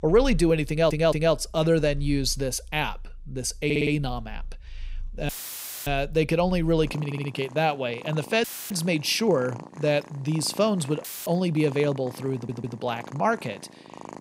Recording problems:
animal sounds; noticeable; throughout; 15 dB below the speech
audio stuttering; 4 times, first at 0.5 s
audio cutting out; filled with static; at 5.5 s for 0.5 s, at 8.5 s and at 11 s

